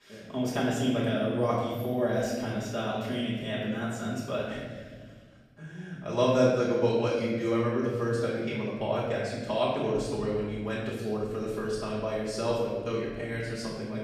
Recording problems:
room echo; strong; dies away in 1.9 s
off-mic speech; far

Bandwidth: 15 kHz